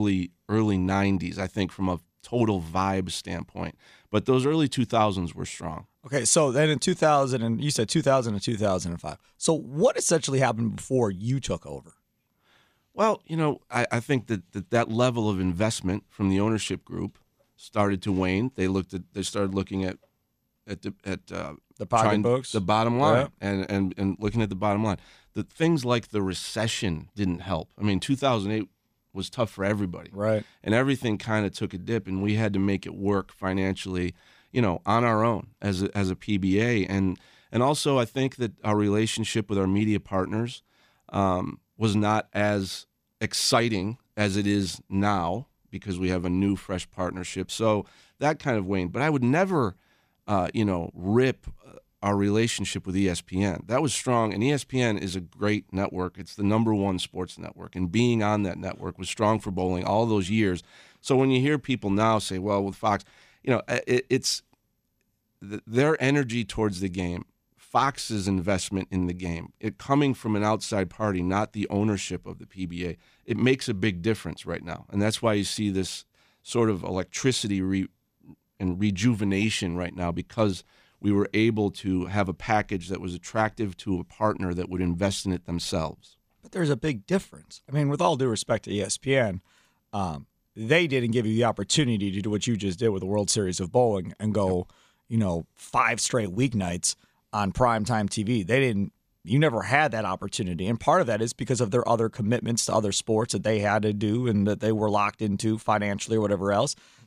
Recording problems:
abrupt cut into speech; at the start

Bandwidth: 15 kHz